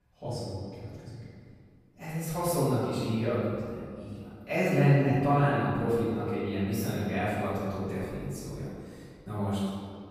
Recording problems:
room echo; strong; dies away in 1.9 s
off-mic speech; far

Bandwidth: 15 kHz